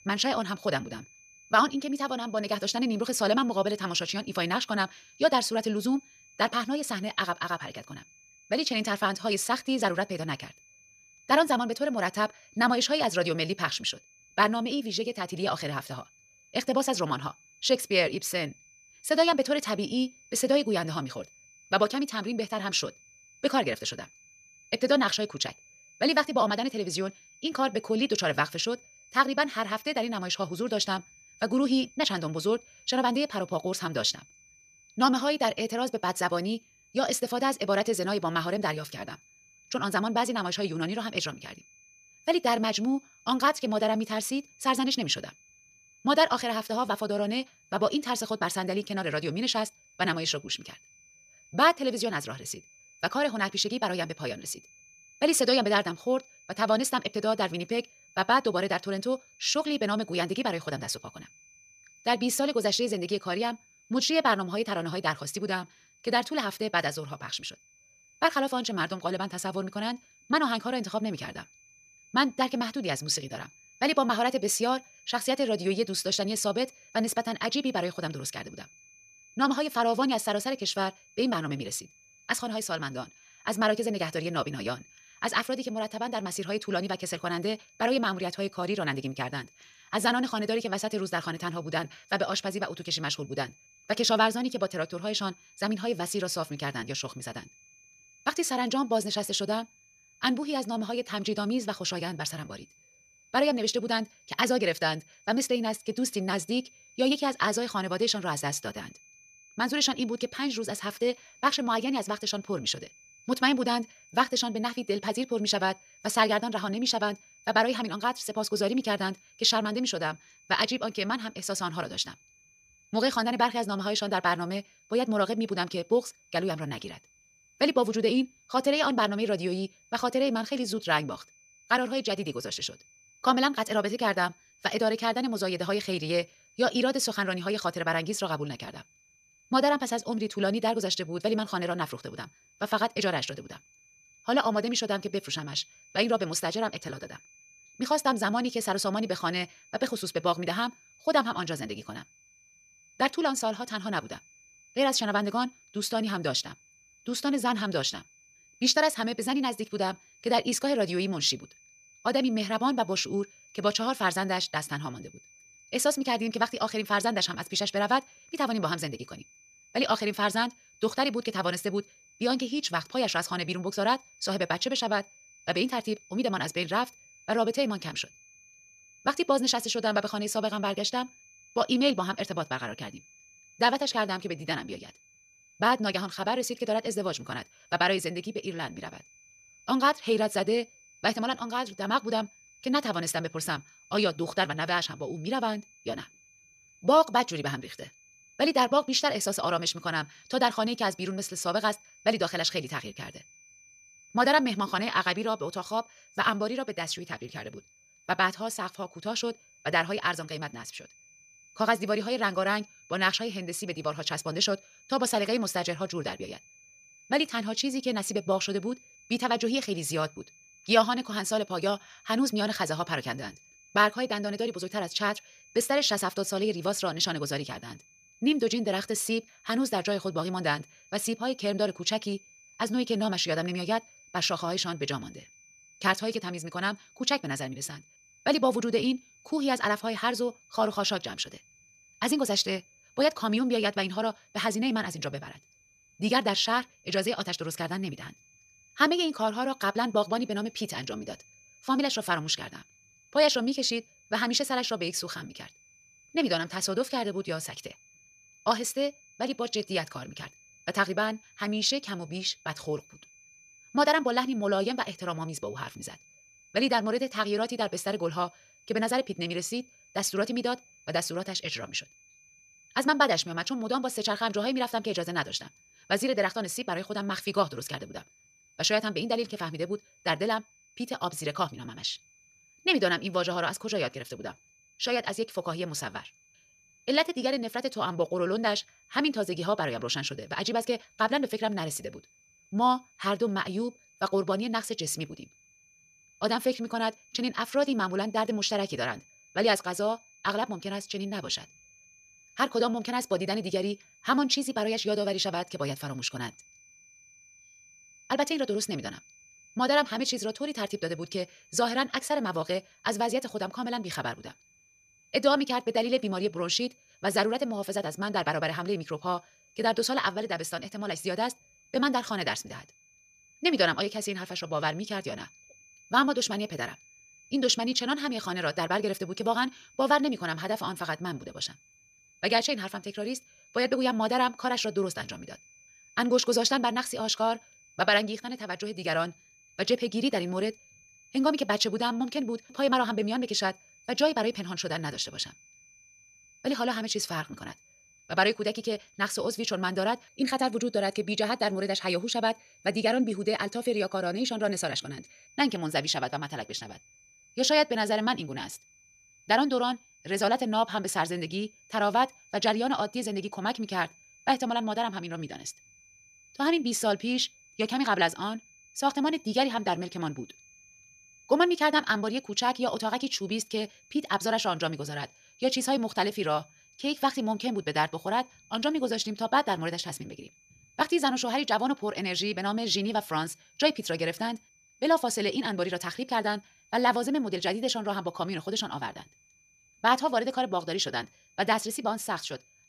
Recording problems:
wrong speed, natural pitch; too fast; 1.5 times normal speed
high-pitched whine; faint; throughout; 2.5 kHz, 25 dB below the speech

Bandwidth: 14.5 kHz